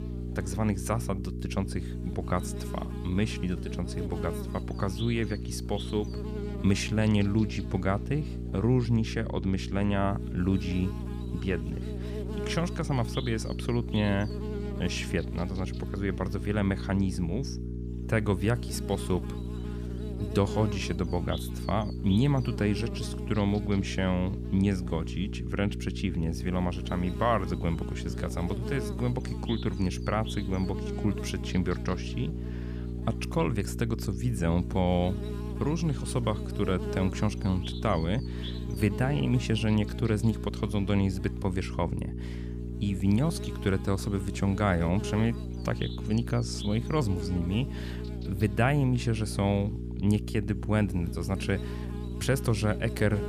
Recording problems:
electrical hum; loud; throughout; 60 Hz, 9 dB below the speech

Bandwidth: 15 kHz